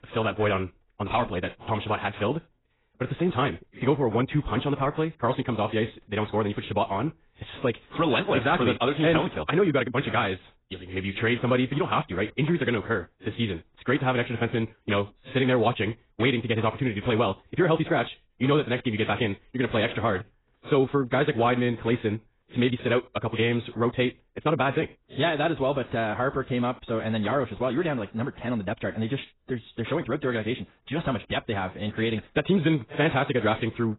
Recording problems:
garbled, watery; badly; nothing above 4 kHz
wrong speed, natural pitch; too fast; 1.7 times normal speed

